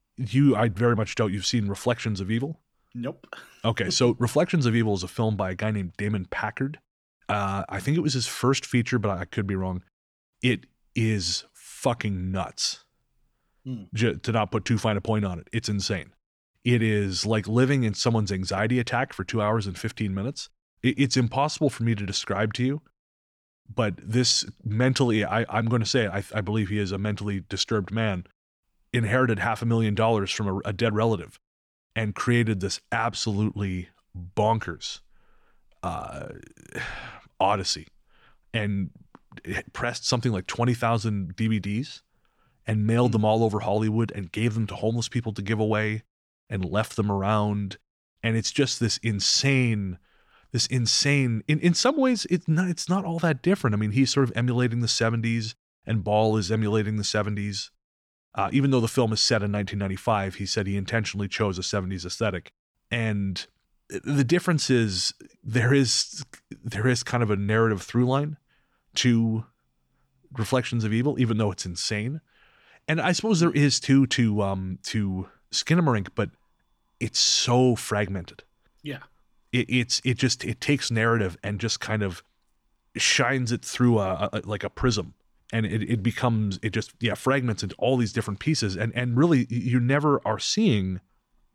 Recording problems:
none

